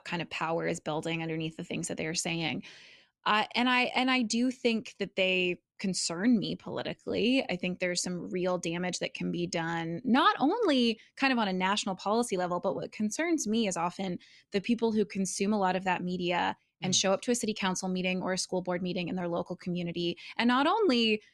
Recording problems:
uneven, jittery; strongly; from 6.5 to 15 s

